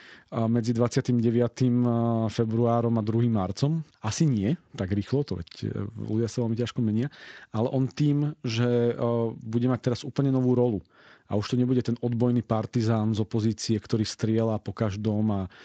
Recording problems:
garbled, watery; slightly; nothing above 7.5 kHz

